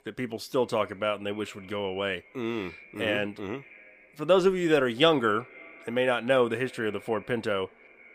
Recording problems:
echo of what is said; faint; throughout; 240 ms later, 25 dB below the speech

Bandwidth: 15 kHz